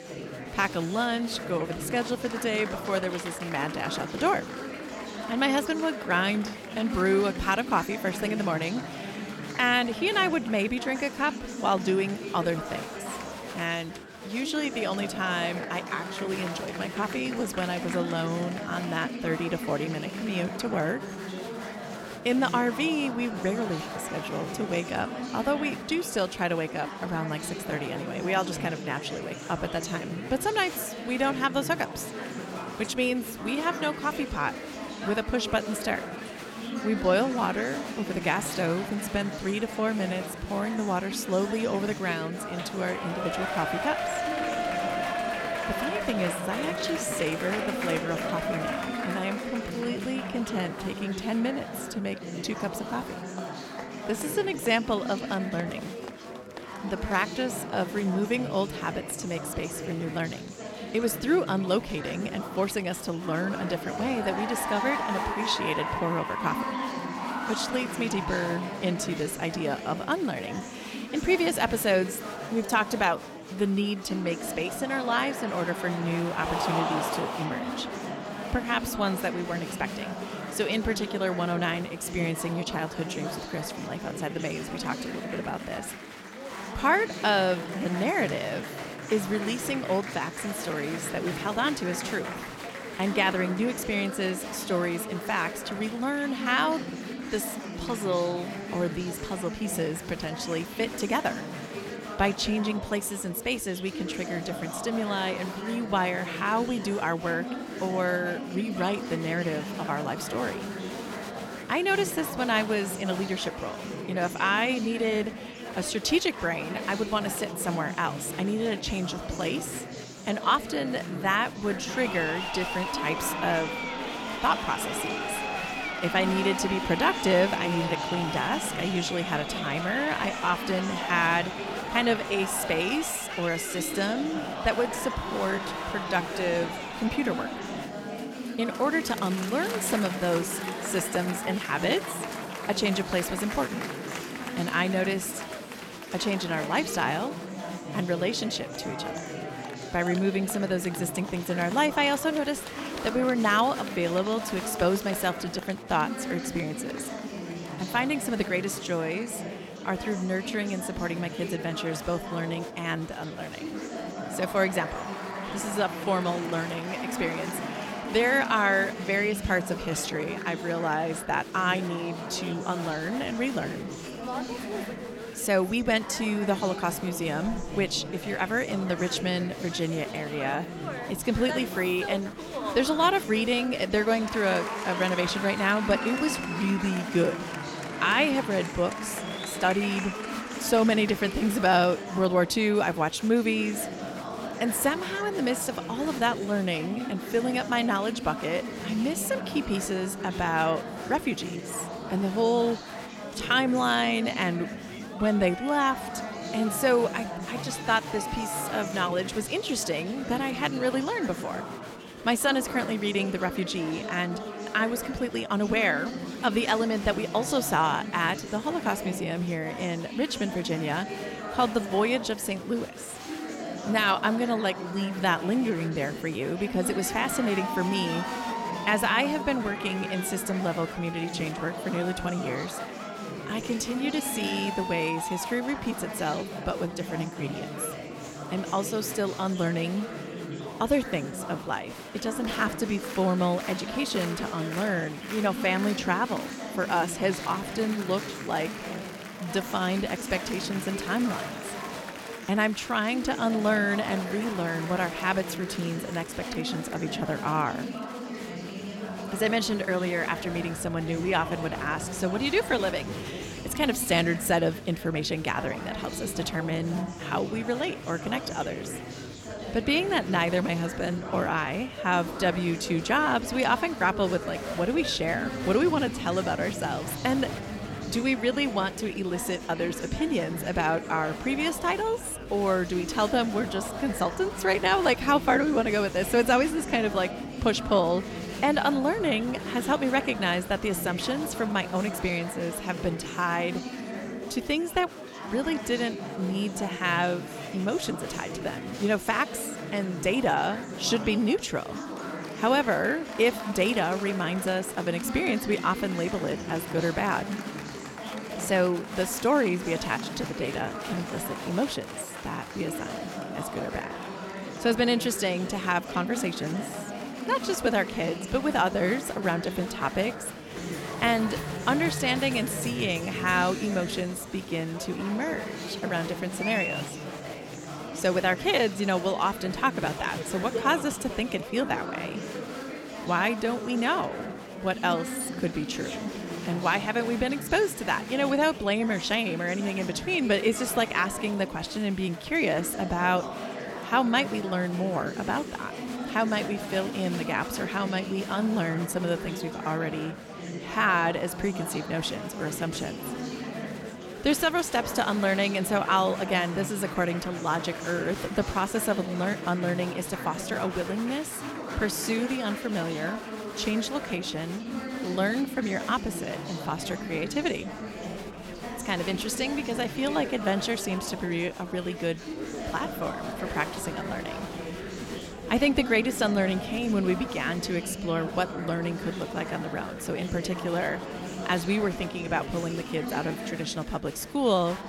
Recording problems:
chatter from many people; loud; throughout; 7 dB below the speech

